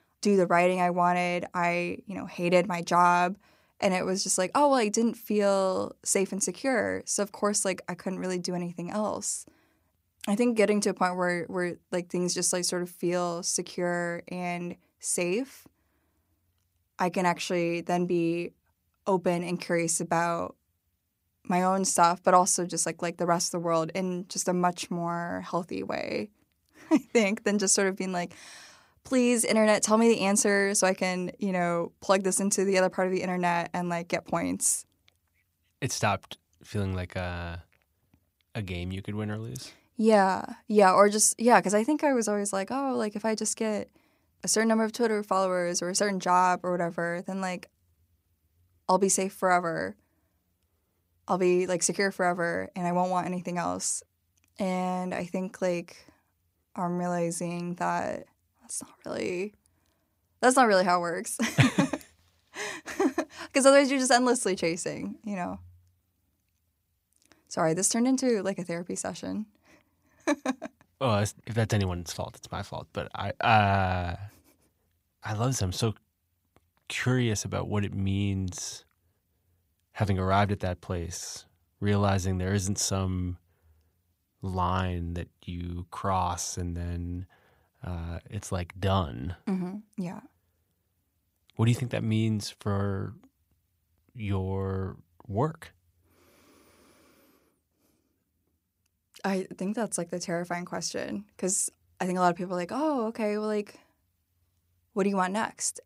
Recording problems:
none

